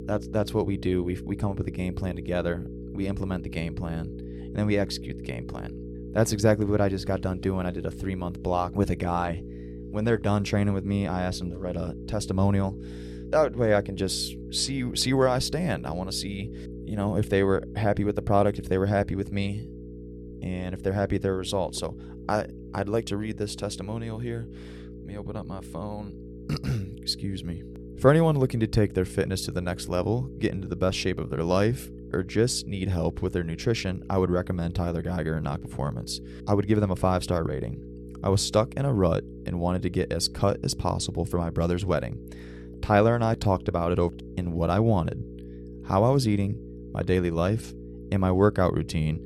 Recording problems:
electrical hum; noticeable; throughout; 60 Hz, 15 dB below the speech

